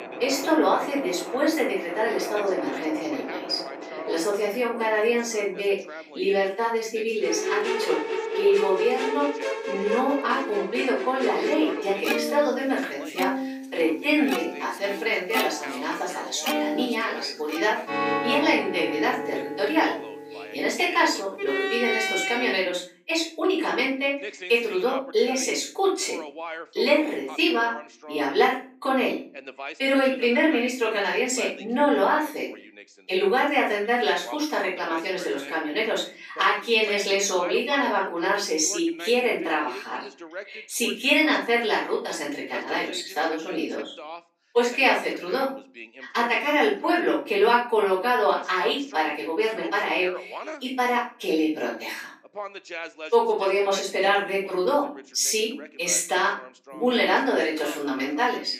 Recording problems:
off-mic speech; far
room echo; noticeable; dies away in 0.4 s
thin; very slightly; fading below 300 Hz
background music; loud; until 22 s; 6 dB below the speech
voice in the background; noticeable; throughout; 15 dB below the speech

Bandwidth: 15 kHz